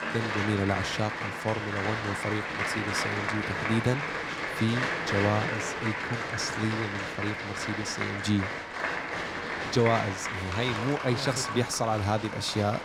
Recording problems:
crowd noise; loud; throughout; 1 dB below the speech

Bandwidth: 19 kHz